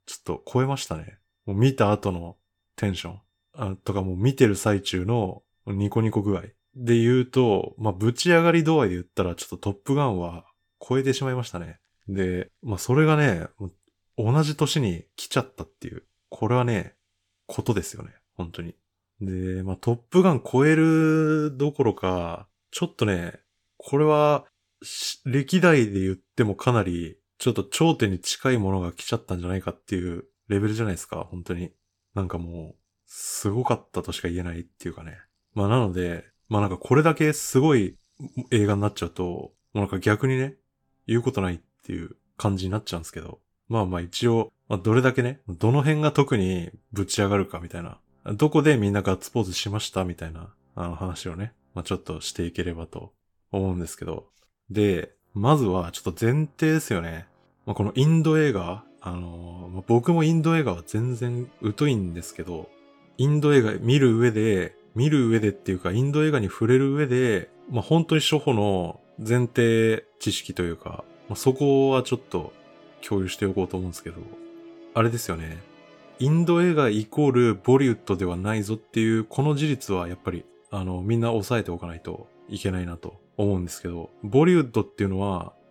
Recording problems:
background music; faint; throughout; 30 dB below the speech

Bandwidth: 17 kHz